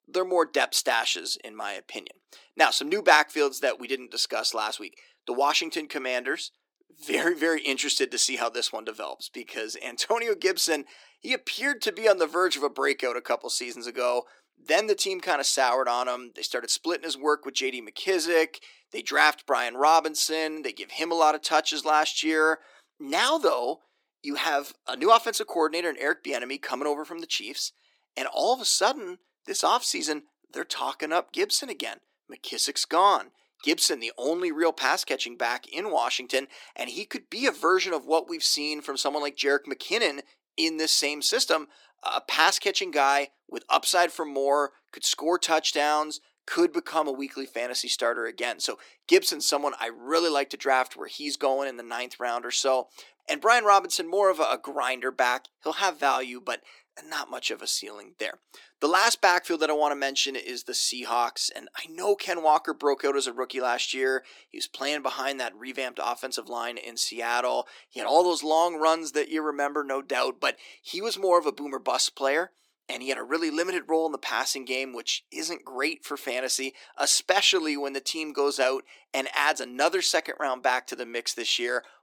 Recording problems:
thin; somewhat; fading below 300 Hz

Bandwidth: 18 kHz